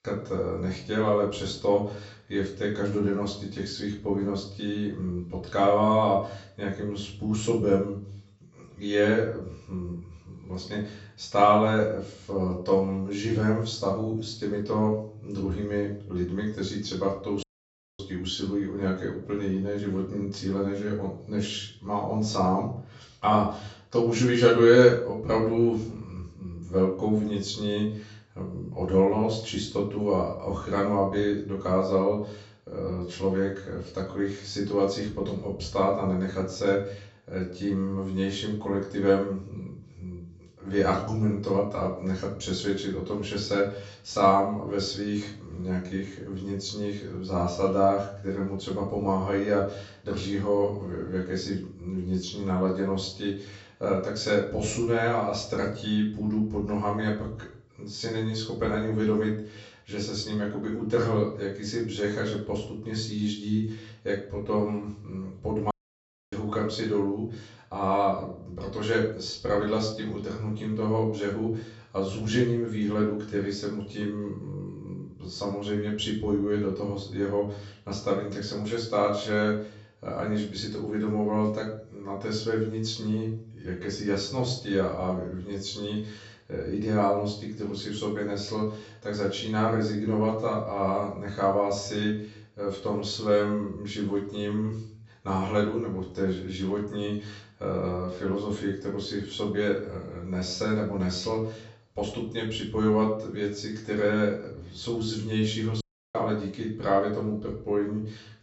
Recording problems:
off-mic speech; far
high frequencies cut off; noticeable; nothing above 7.5 kHz
room echo; slight; dies away in 0.4 s
audio cutting out; at 17 s for 0.5 s, at 1:06 for 0.5 s and at 1:46

